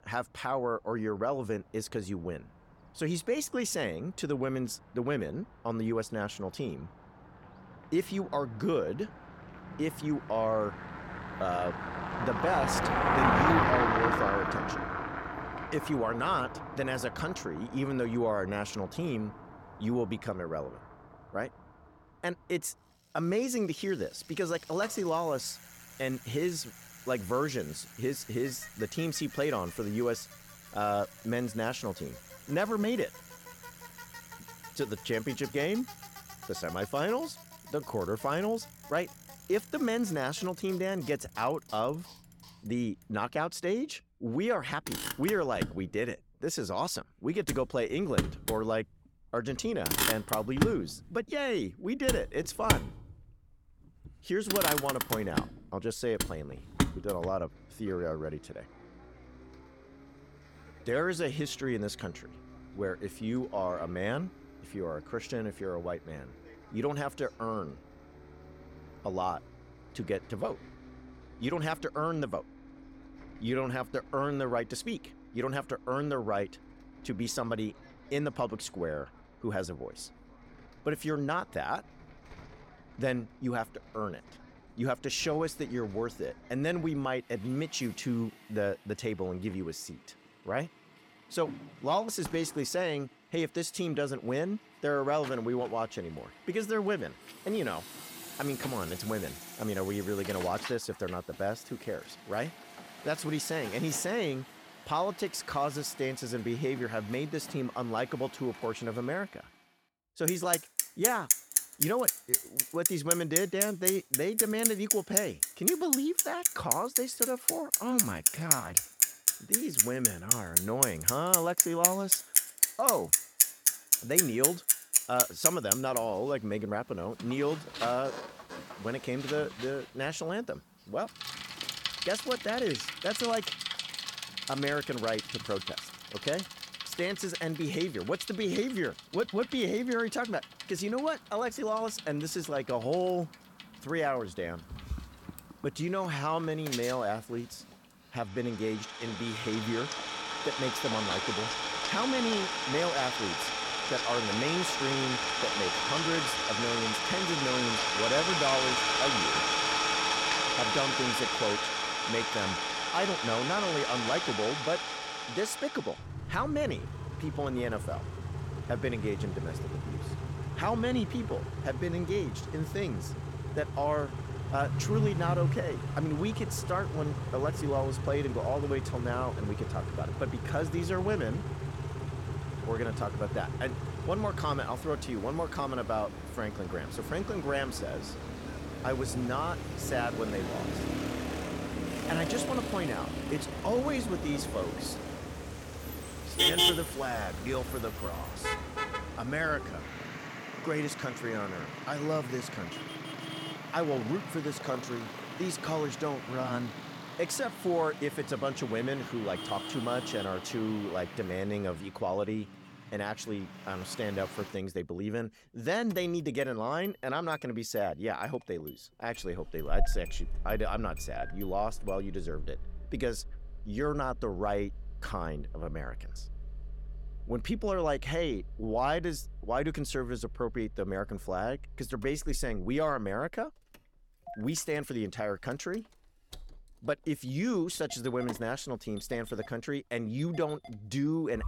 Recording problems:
traffic noise; very loud; throughout; 2 dB above the speech

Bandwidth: 17 kHz